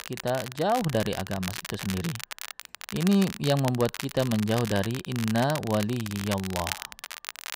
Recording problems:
crackle, like an old record; loud; 9 dB below the speech

